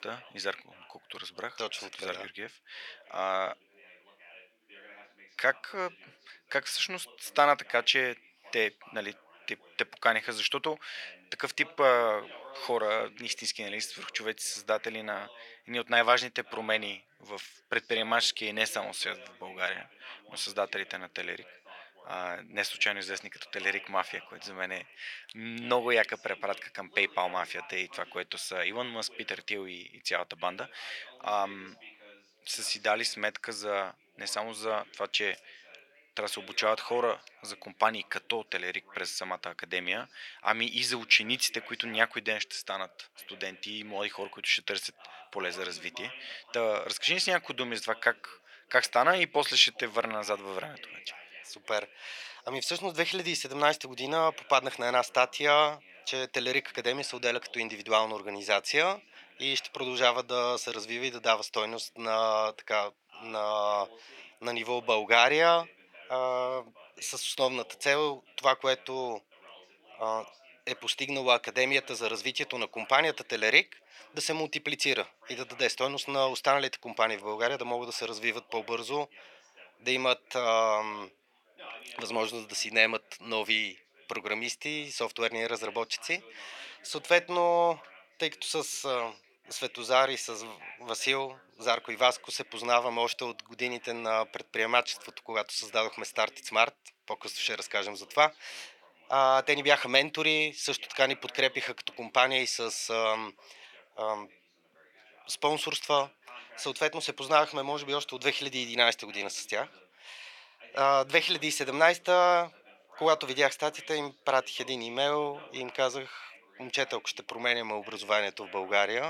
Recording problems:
thin; very; fading below 650 Hz
background chatter; faint; throughout; 2 voices, 25 dB below the speech
abrupt cut into speech; at the end

